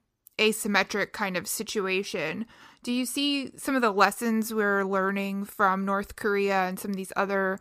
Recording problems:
none

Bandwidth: 15 kHz